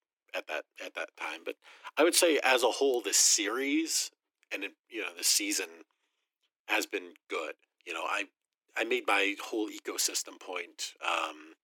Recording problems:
thin; very; fading below 300 Hz

